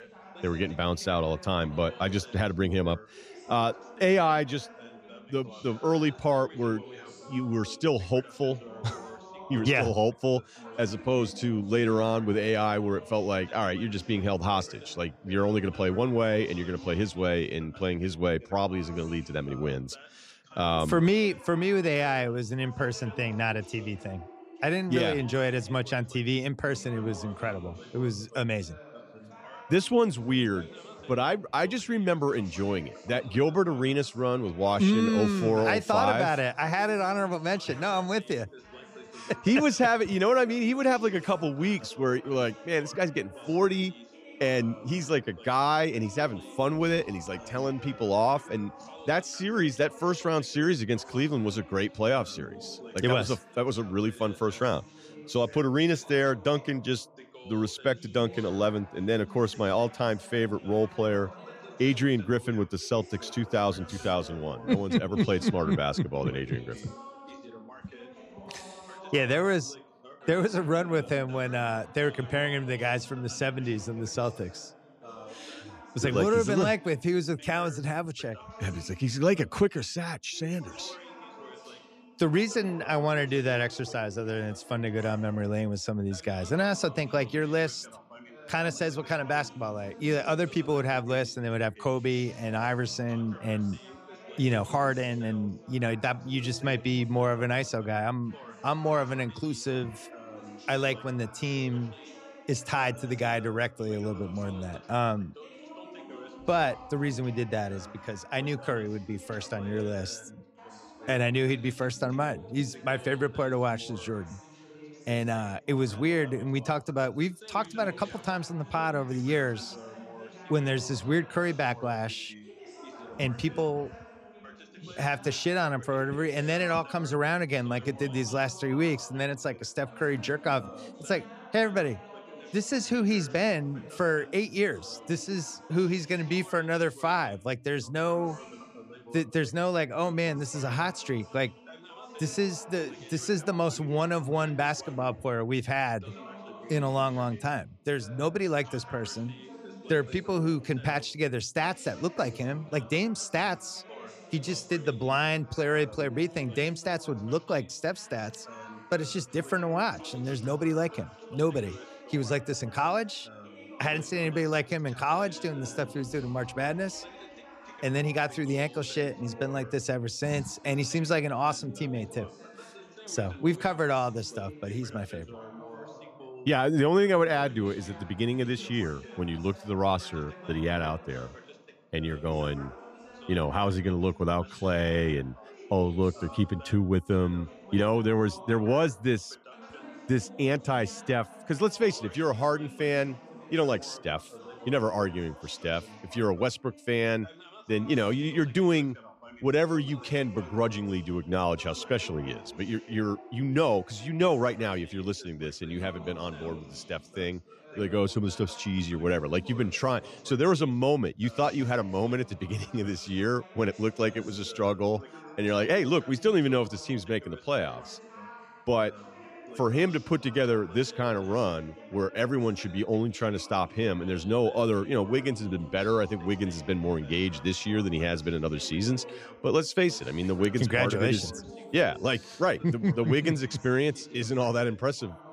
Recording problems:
background chatter; noticeable; throughout; 2 voices, 20 dB below the speech

